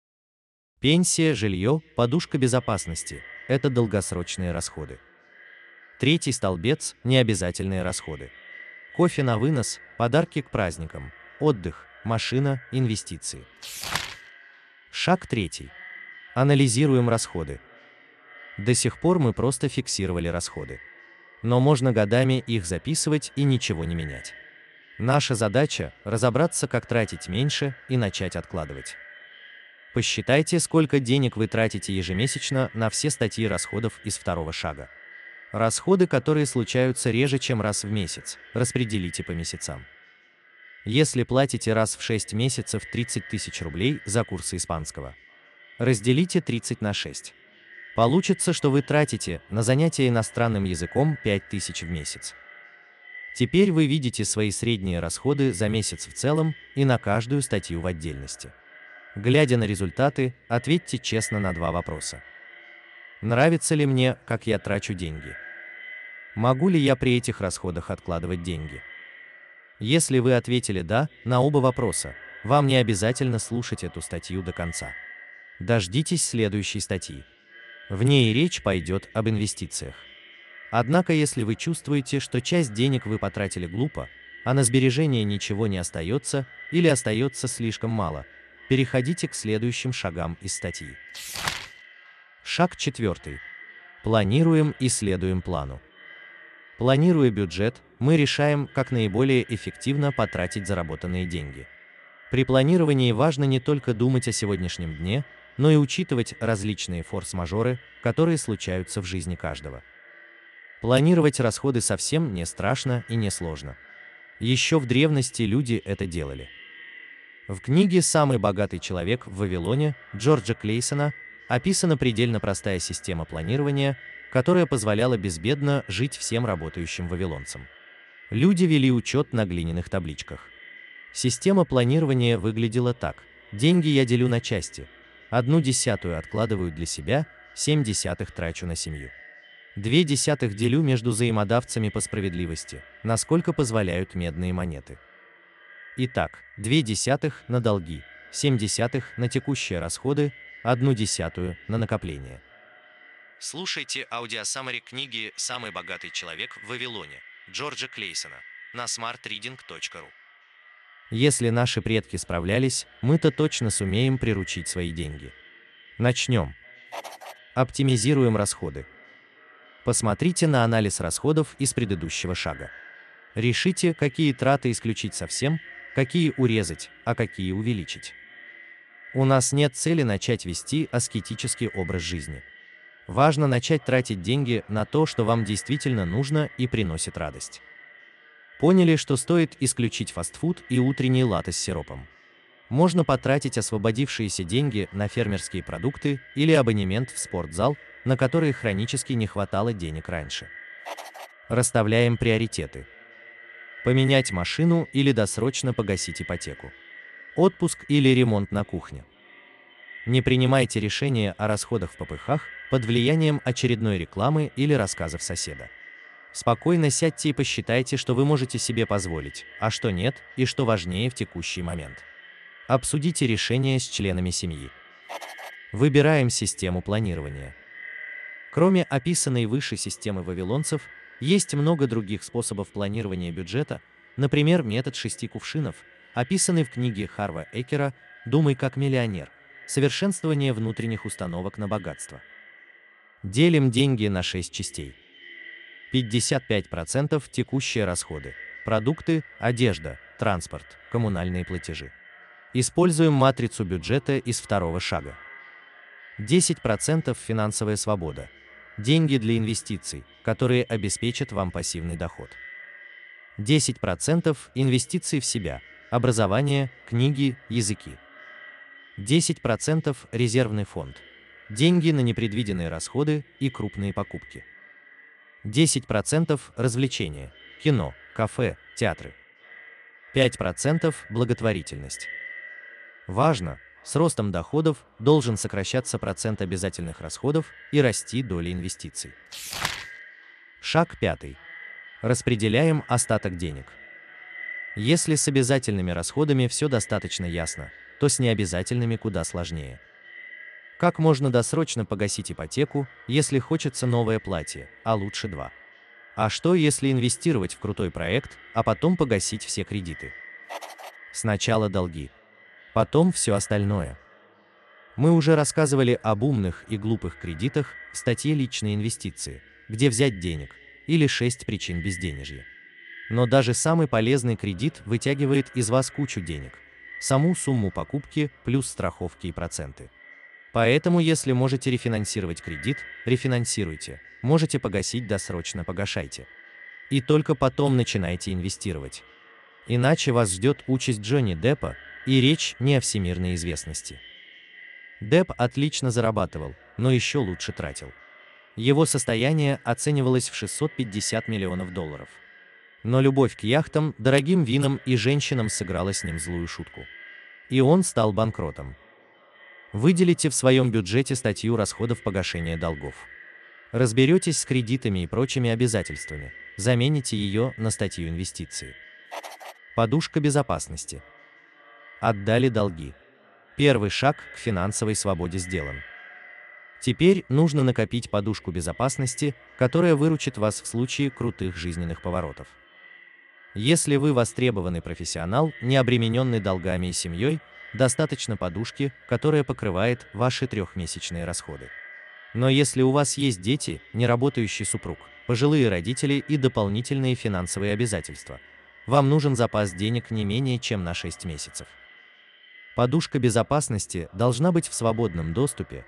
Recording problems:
echo of what is said; faint; throughout; 580 ms later, 20 dB below the speech

